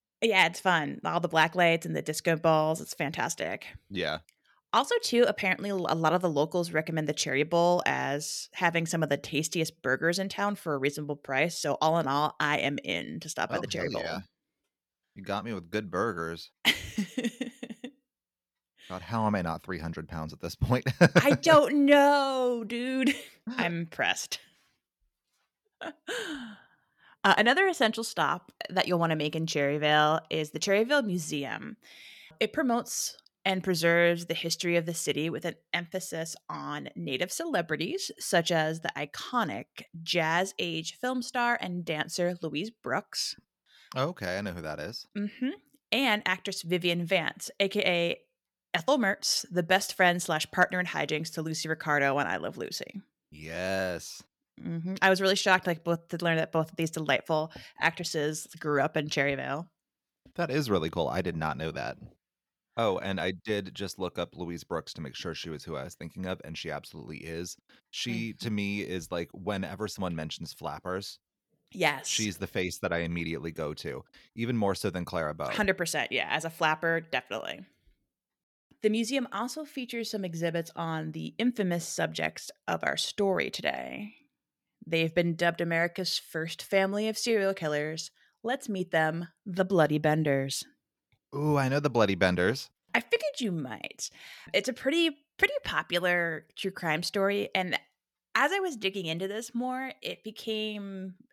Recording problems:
none

